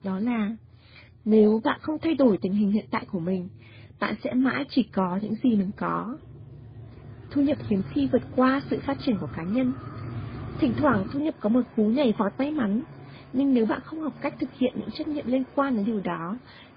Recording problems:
garbled, watery; badly; nothing above 5 kHz
traffic noise; noticeable; throughout; 15 dB below the speech

